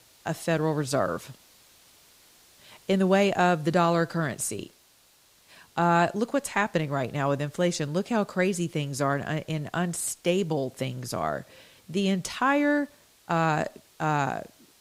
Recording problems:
hiss; faint; throughout; 30 dB below the speech

